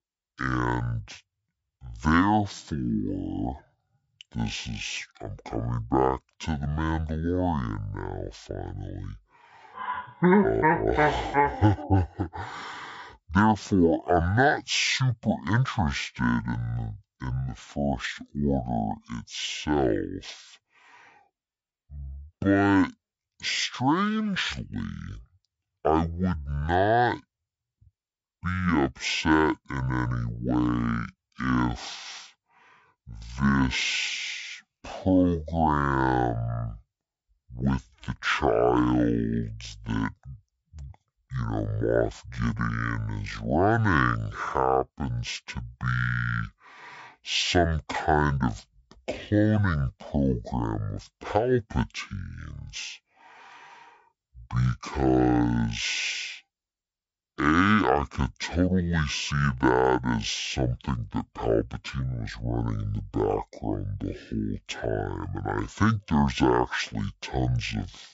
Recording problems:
wrong speed and pitch; too slow and too low; 0.5 times normal speed

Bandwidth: 7.5 kHz